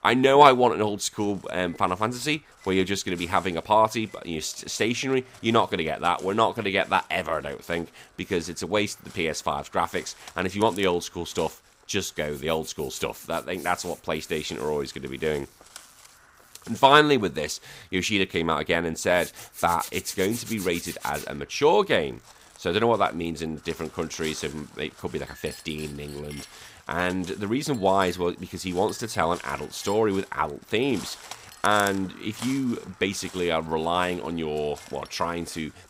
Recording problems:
household noises; noticeable; throughout; 20 dB below the speech
animal sounds; faint; throughout; 20 dB below the speech

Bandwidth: 15.5 kHz